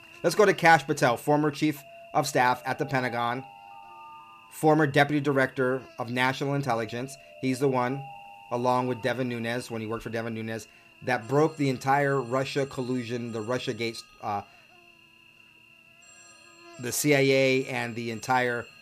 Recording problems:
electrical hum; faint; throughout; 60 Hz, 25 dB below the speech
alarms or sirens; faint; throughout; 25 dB below the speech

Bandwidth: 14.5 kHz